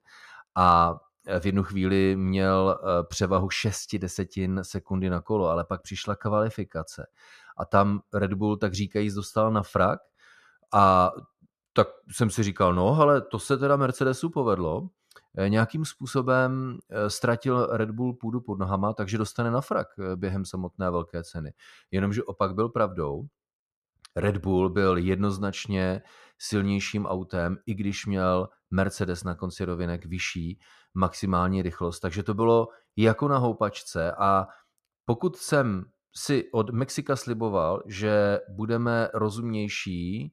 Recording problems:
muffled; slightly; fading above 1.5 kHz

